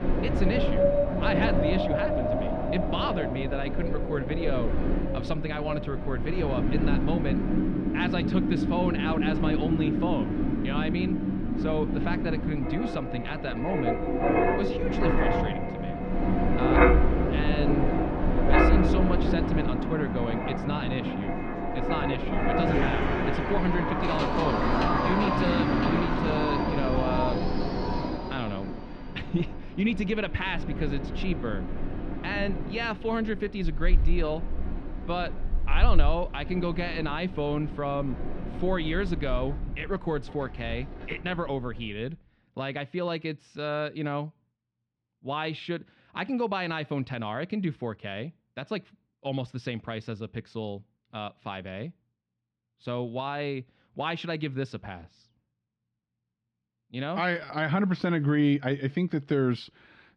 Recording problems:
muffled; slightly; fading above 3.5 kHz
wind in the background; very loud; until 41 s; 3 dB above the speech

